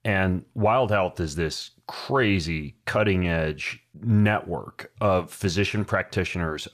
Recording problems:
none

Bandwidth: 14.5 kHz